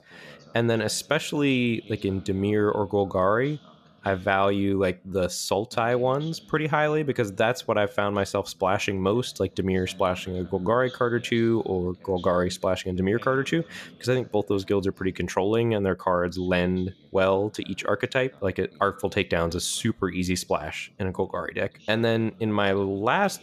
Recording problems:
voice in the background; faint; throughout; 25 dB below the speech

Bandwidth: 14.5 kHz